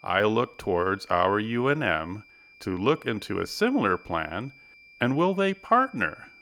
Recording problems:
high-pitched whine; faint; throughout; 2.5 kHz, 25 dB below the speech

